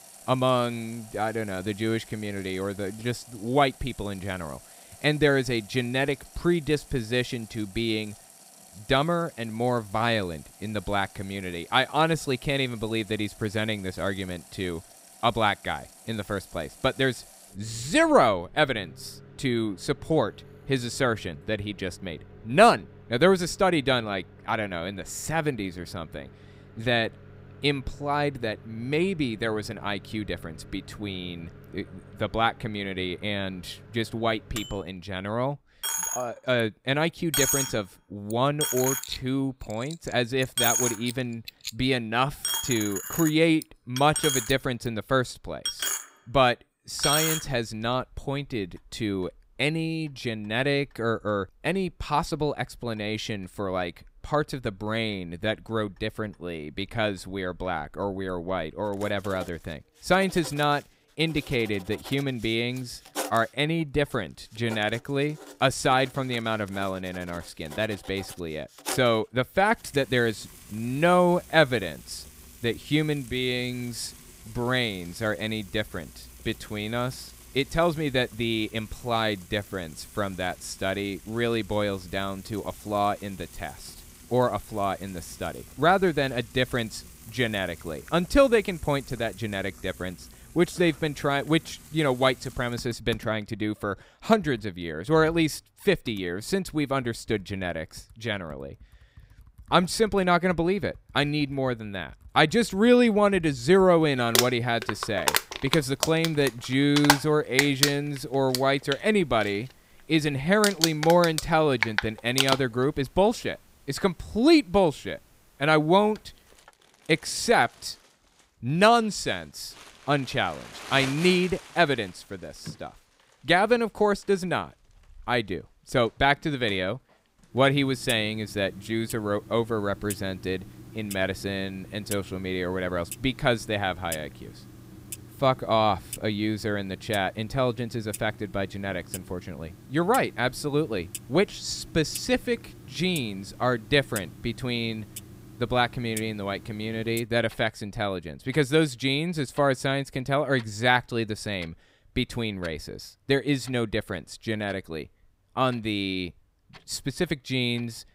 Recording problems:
household noises; loud; throughout; 8 dB below the speech

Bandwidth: 15.5 kHz